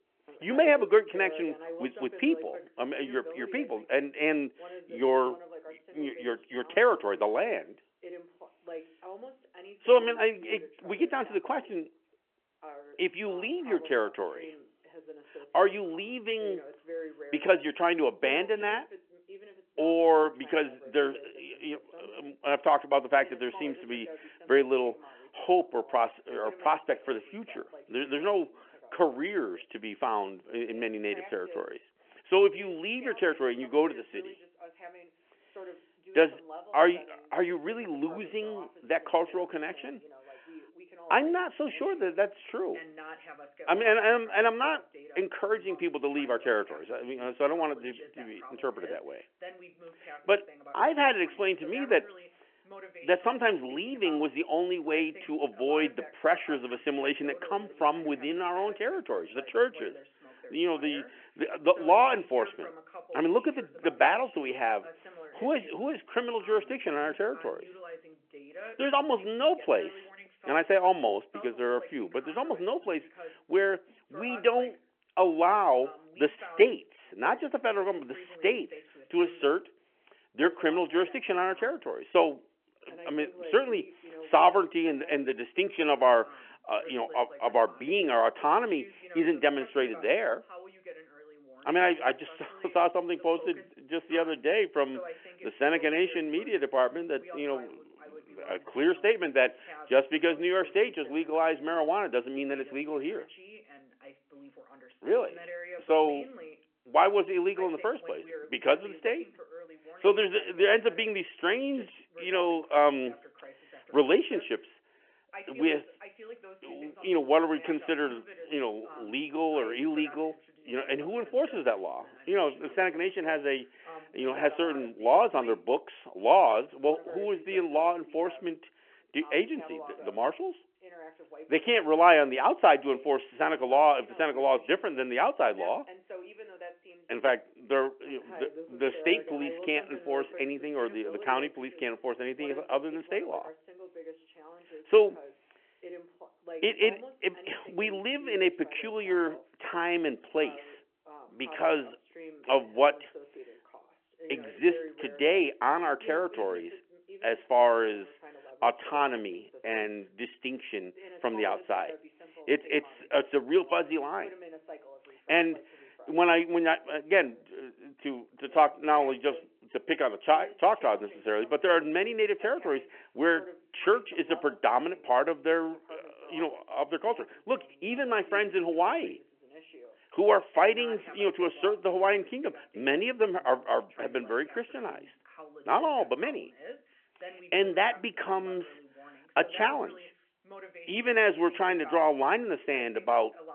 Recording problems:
phone-call audio
voice in the background; noticeable; throughout; 20 dB below the speech

